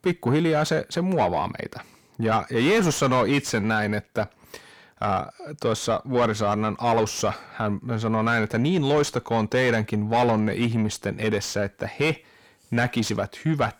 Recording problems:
distortion; heavy; 7 dB below the speech

